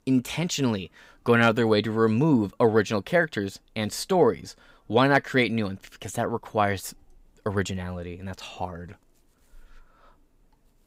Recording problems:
none

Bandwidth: 15.5 kHz